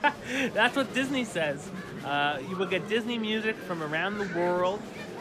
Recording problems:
murmuring crowd; noticeable; throughout; 10 dB below the speech

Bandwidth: 14.5 kHz